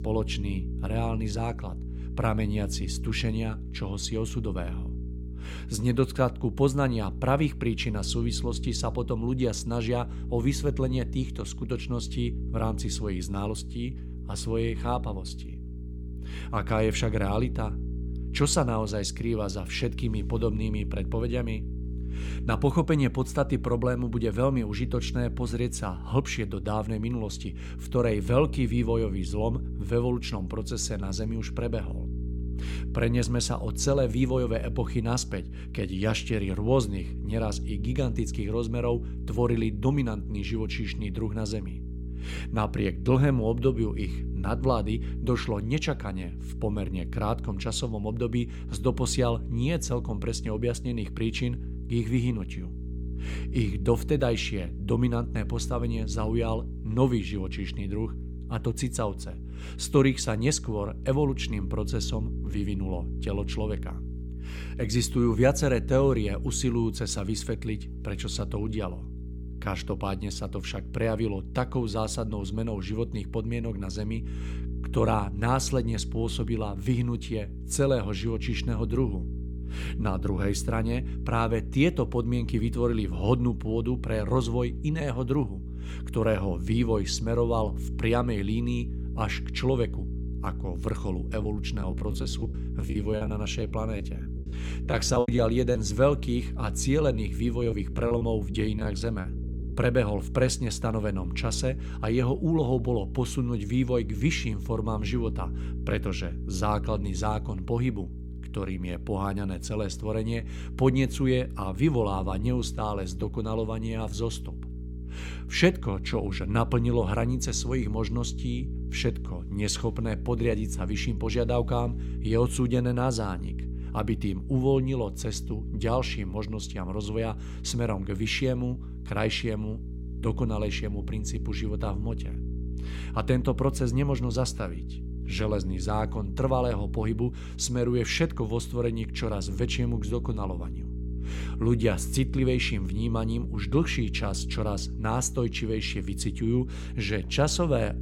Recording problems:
electrical hum; noticeable; throughout; 60 Hz, 15 dB below the speech
choppy; very; from 1:31 to 1:36 and from 1:38 to 1:39; 14% of the speech affected

